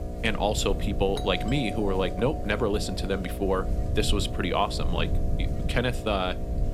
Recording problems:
electrical hum; noticeable; throughout; 60 Hz, 10 dB below the speech
low rumble; faint; throughout; 20 dB below the speech
doorbell; noticeable; from 1 to 4 s; peak 10 dB below the speech

